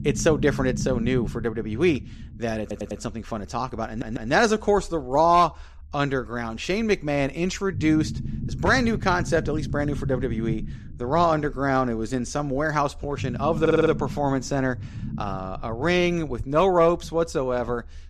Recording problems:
low rumble; noticeable; throughout; 20 dB below the speech
audio stuttering; at 2.5 s, at 4 s and at 14 s

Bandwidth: 14 kHz